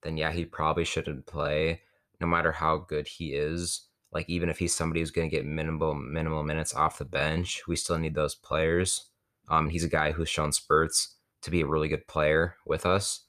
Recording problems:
uneven, jittery; strongly; from 1.5 to 12 s

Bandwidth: 14.5 kHz